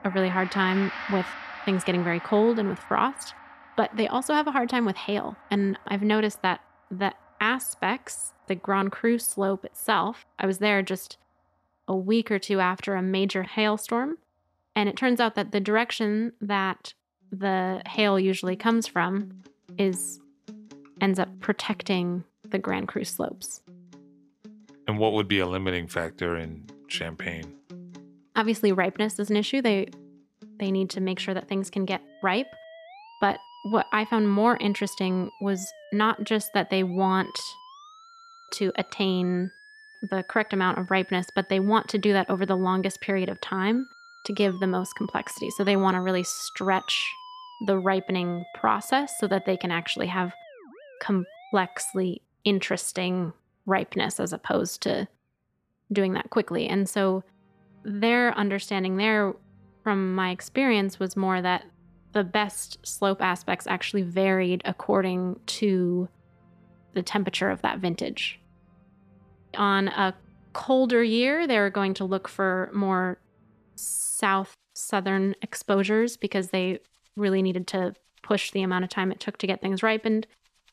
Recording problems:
background music; noticeable; throughout; 20 dB below the speech

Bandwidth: 14 kHz